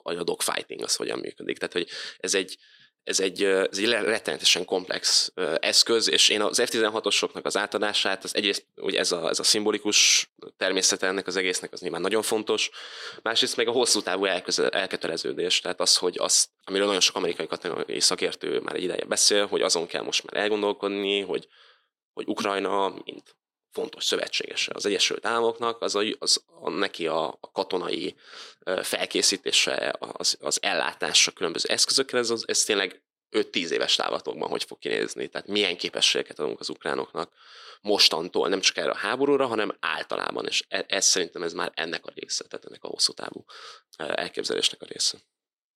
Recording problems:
thin; somewhat; fading below 300 Hz

